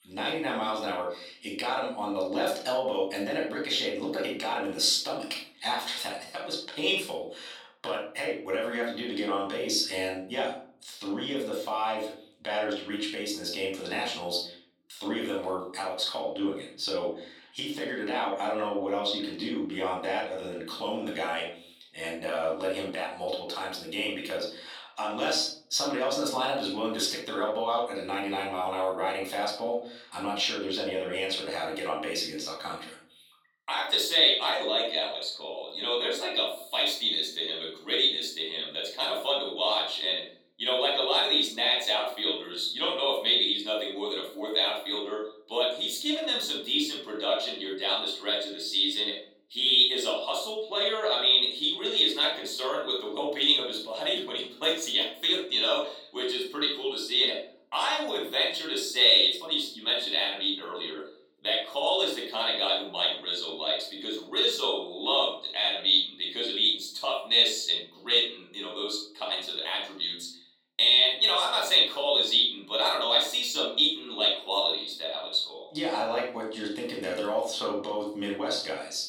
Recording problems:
off-mic speech; far
room echo; noticeable; dies away in 0.5 s
thin; very slightly; fading below 450 Hz

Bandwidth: 17.5 kHz